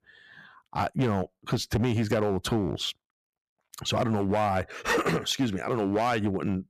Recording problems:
distortion; slight; 6% of the sound clipped

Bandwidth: 14.5 kHz